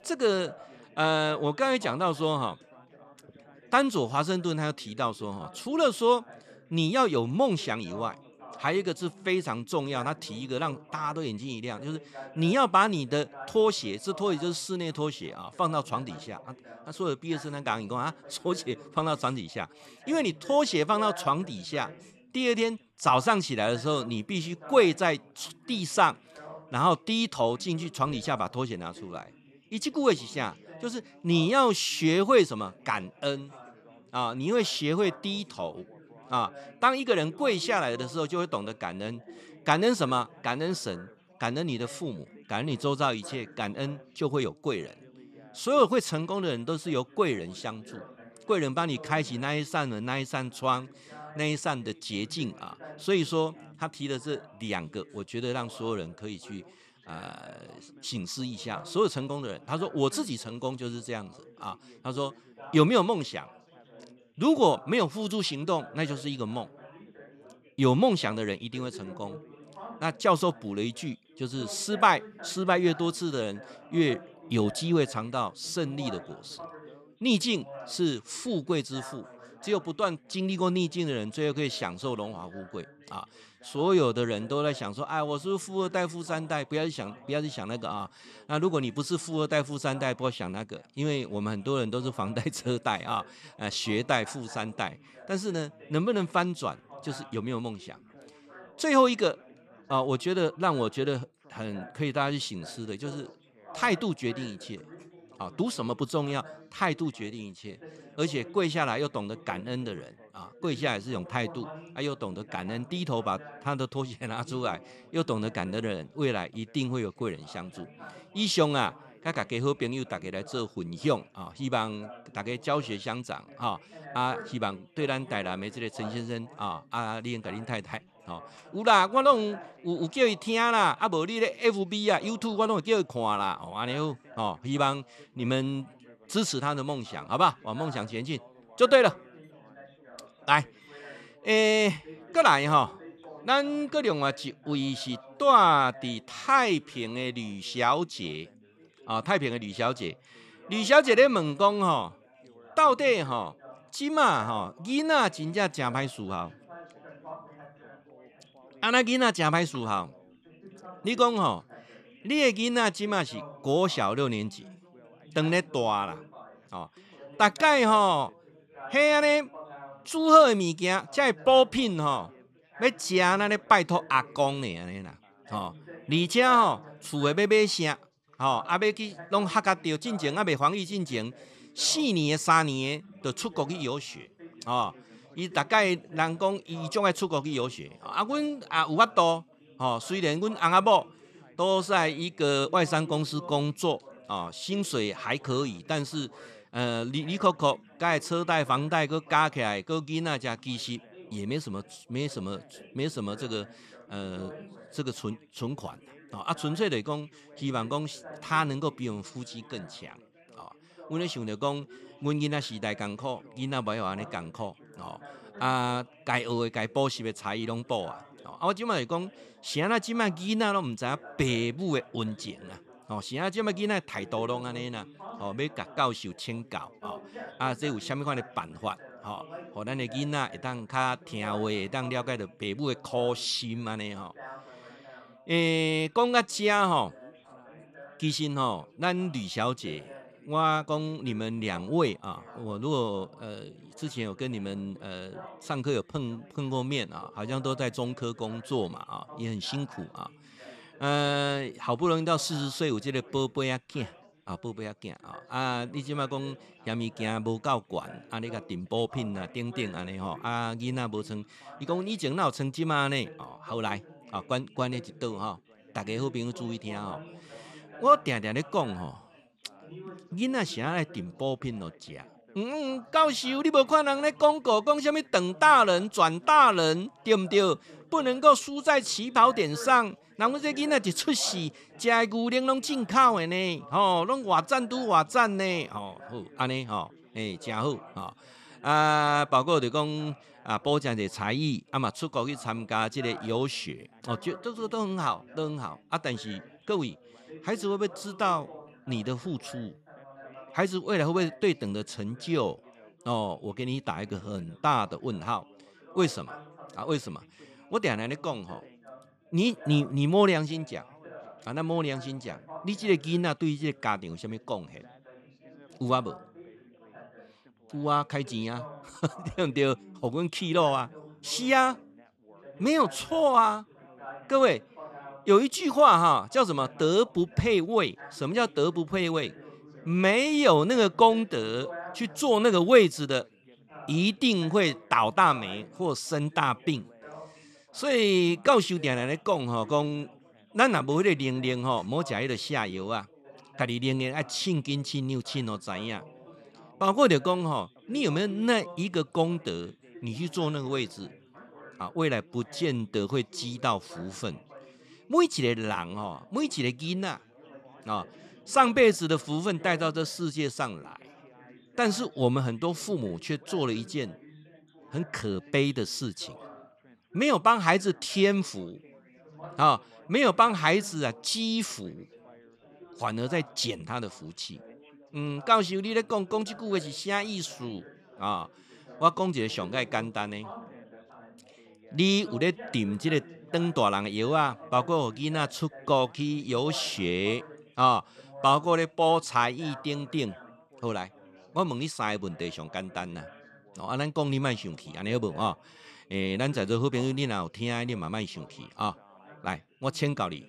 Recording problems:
background chatter; faint; throughout; 4 voices, 20 dB below the speech

